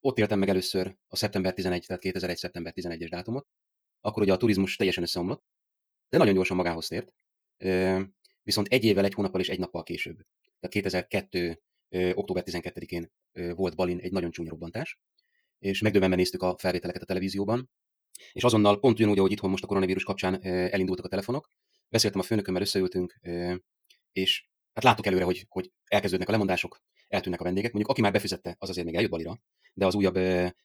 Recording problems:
wrong speed, natural pitch; too fast; 1.7 times normal speed

